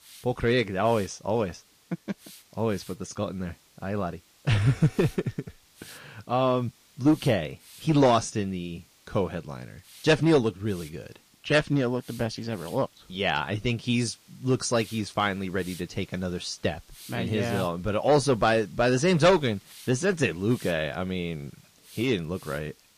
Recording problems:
distortion; slight; 1.7% of the sound clipped
garbled, watery; slightly
hiss; faint; throughout; 25 dB below the speech

